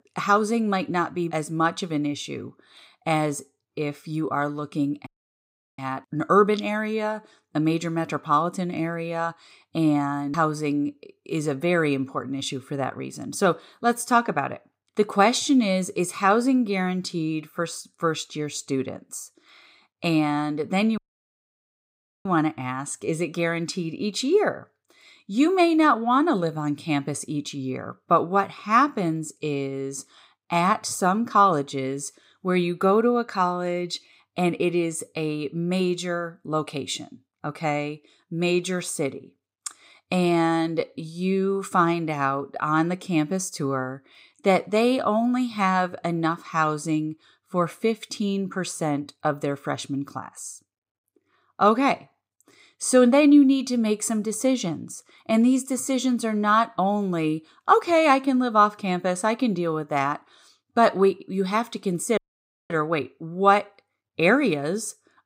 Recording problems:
audio cutting out; at 5 s for 0.5 s, at 21 s for 1.5 s and at 1:02 for 0.5 s

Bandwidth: 15.5 kHz